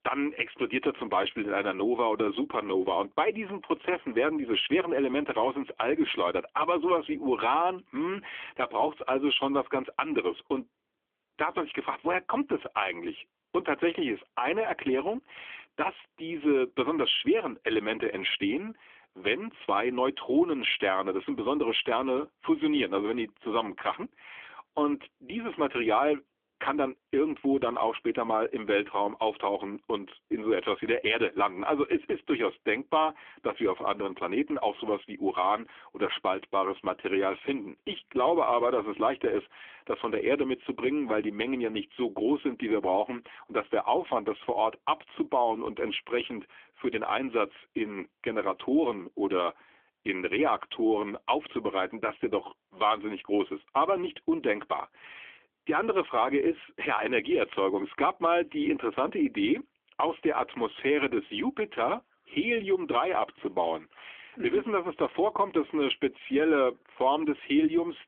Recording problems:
phone-call audio; nothing above 3.5 kHz

